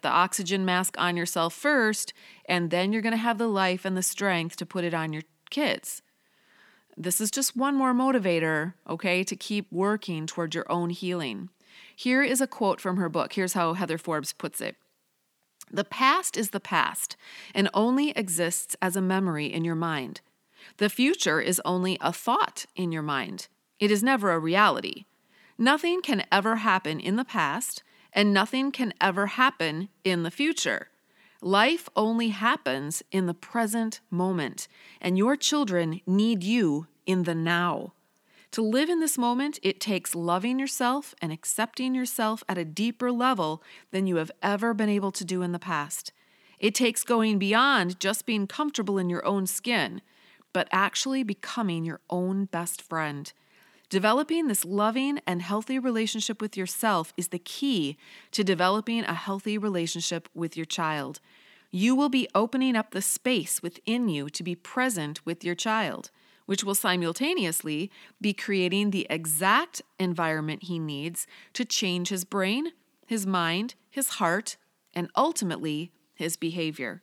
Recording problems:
none

